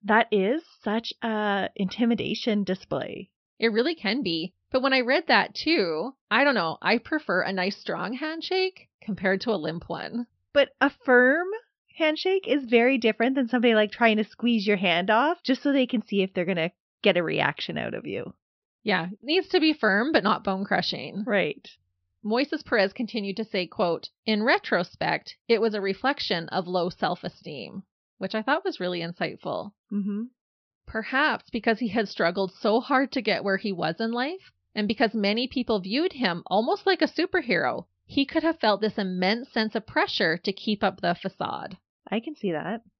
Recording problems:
high frequencies cut off; noticeable; nothing above 5.5 kHz

